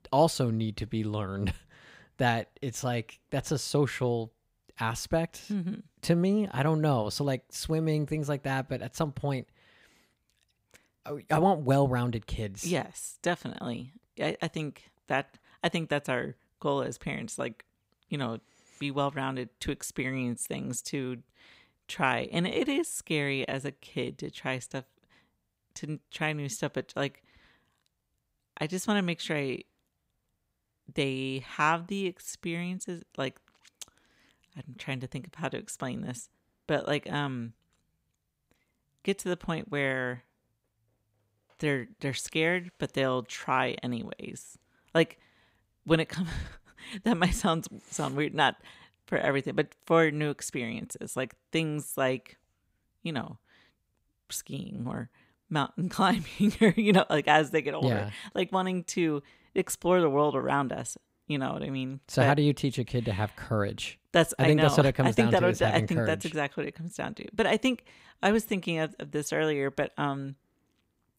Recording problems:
none

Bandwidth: 15.5 kHz